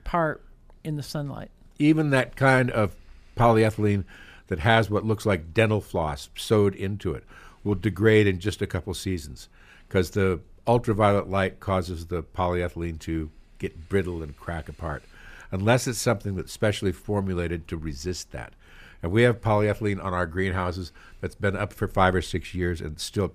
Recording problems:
none

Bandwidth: 15 kHz